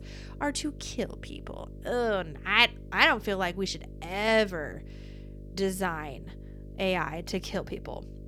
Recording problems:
electrical hum; faint; throughout; 50 Hz, 25 dB below the speech

